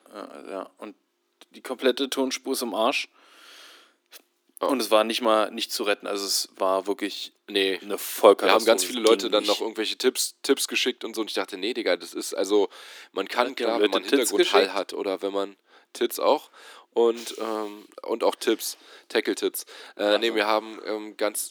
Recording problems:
thin; somewhat; fading below 300 Hz

